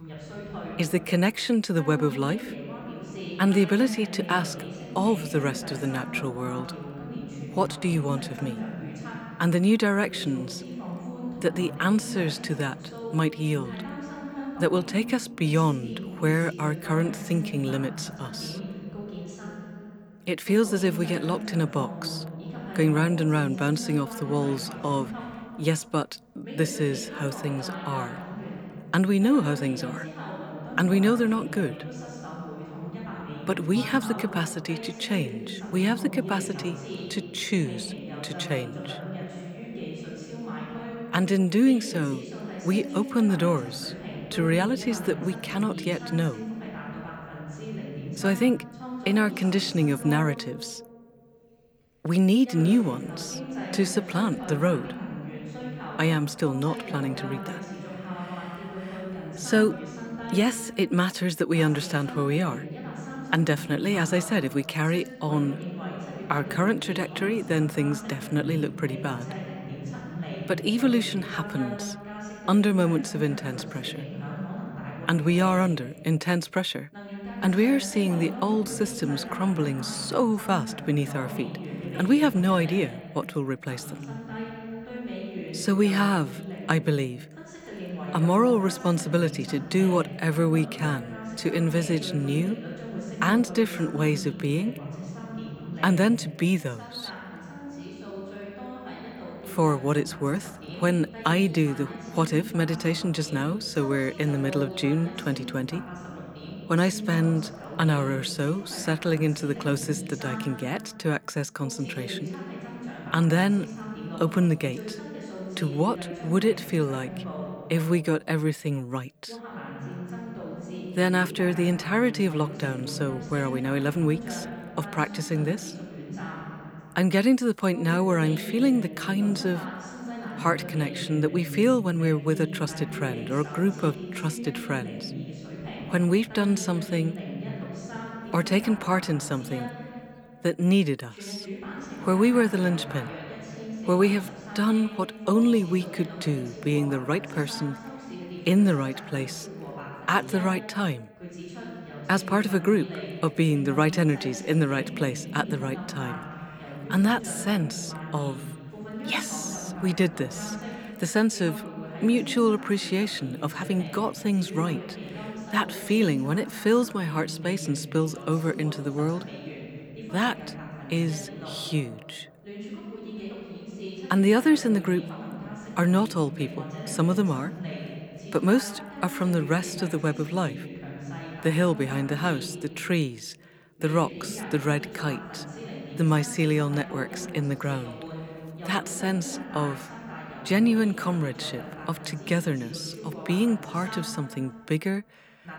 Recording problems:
voice in the background; noticeable; throughout; 10 dB below the speech

